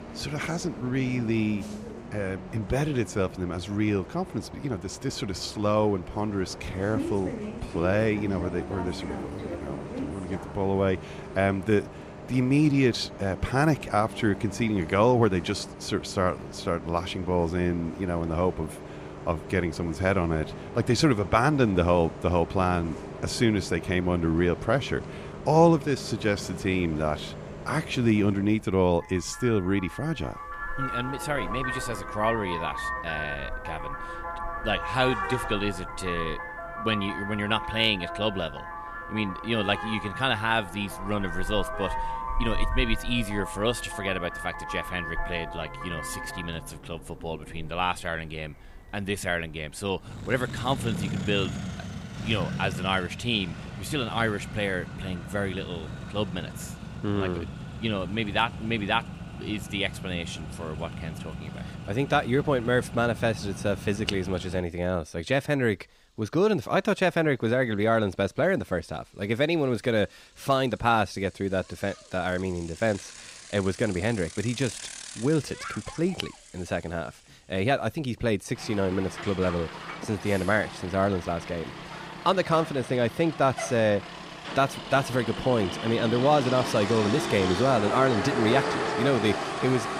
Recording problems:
traffic noise; loud; throughout; 9 dB below the speech

